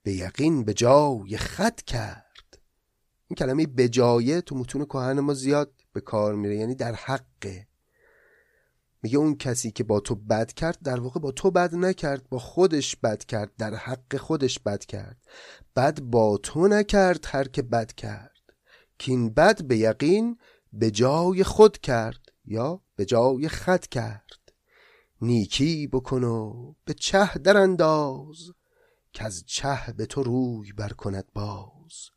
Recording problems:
none

